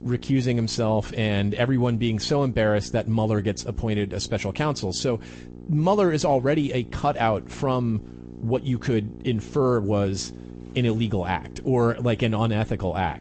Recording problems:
garbled, watery; slightly; nothing above 8 kHz
electrical hum; faint; throughout; 60 Hz, 20 dB below the speech

